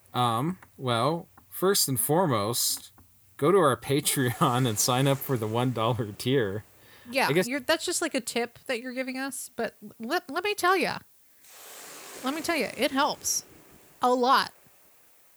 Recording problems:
hiss; faint; throughout; 25 dB below the speech

